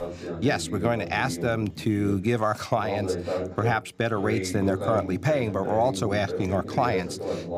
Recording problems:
voice in the background; loud; throughout; 6 dB below the speech

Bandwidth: 15 kHz